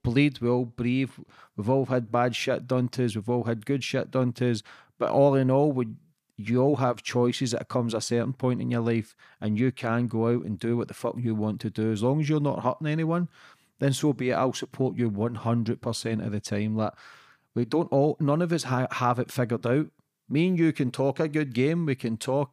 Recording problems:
none

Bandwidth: 15 kHz